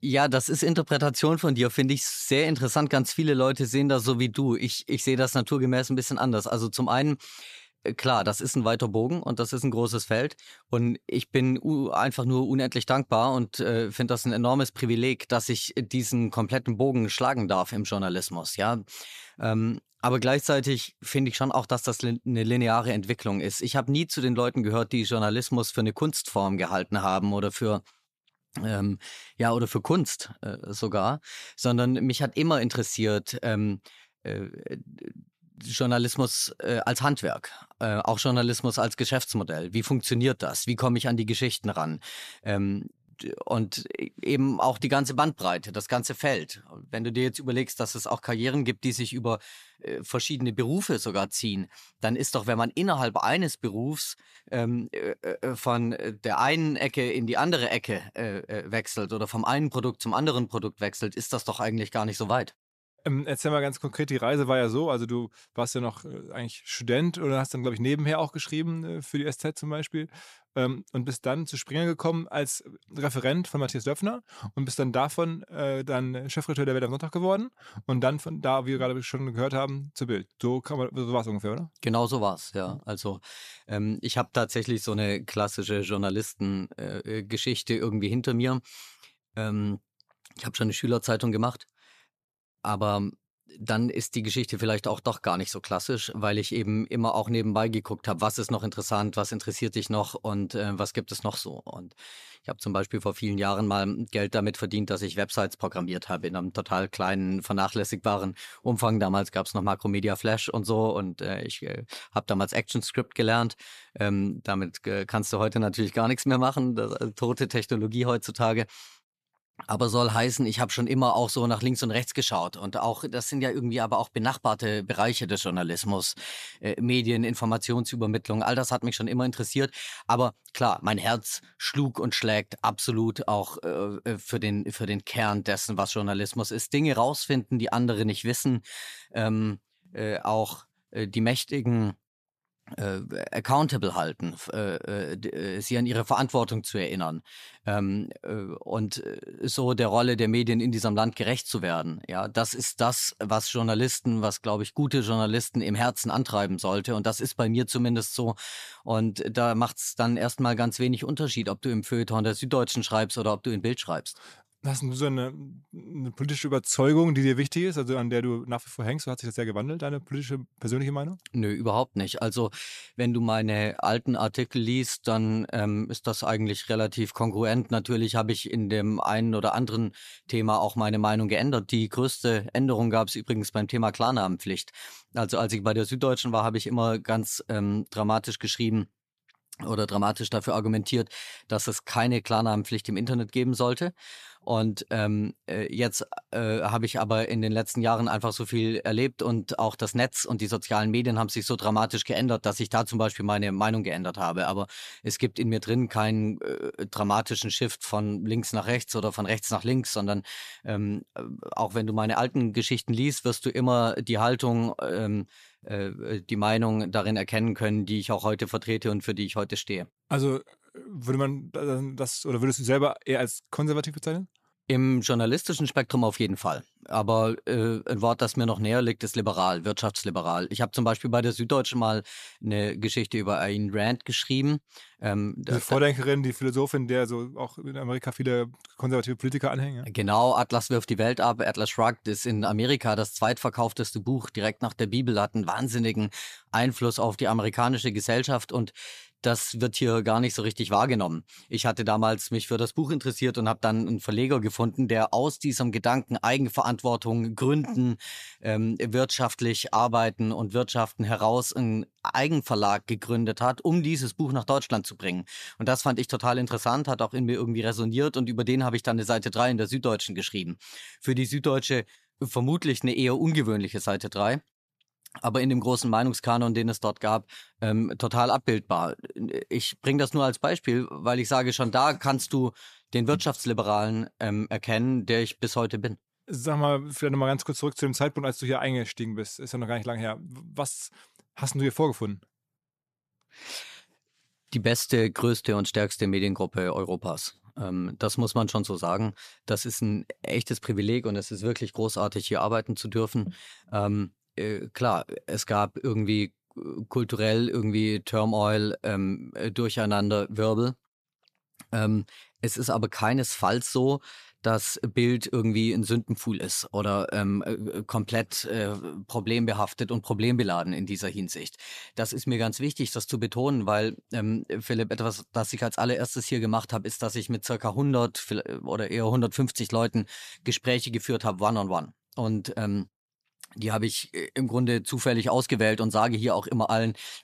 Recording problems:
none

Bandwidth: 14.5 kHz